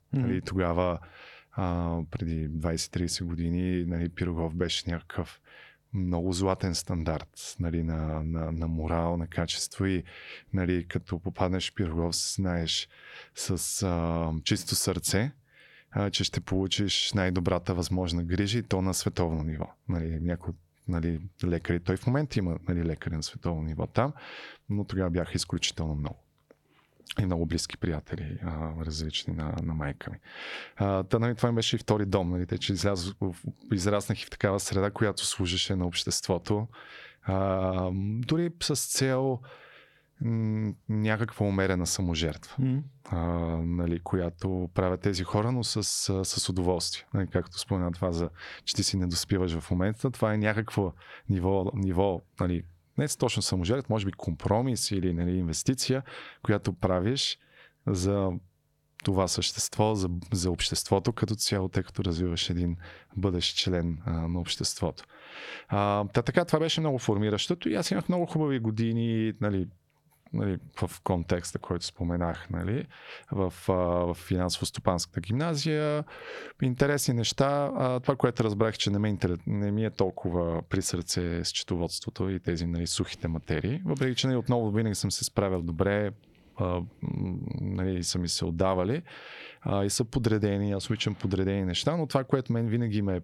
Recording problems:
squashed, flat; heavily

